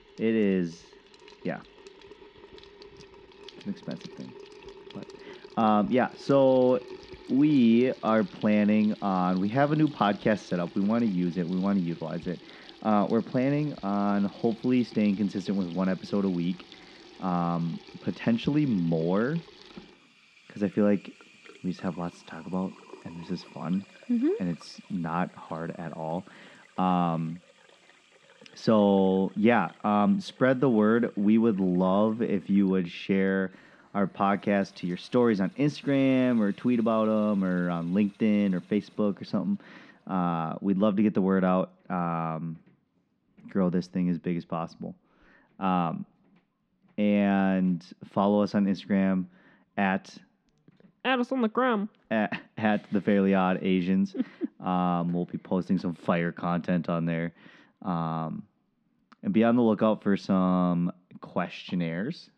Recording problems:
muffled; very slightly; fading above 4 kHz
household noises; faint; throughout; 25 dB below the speech

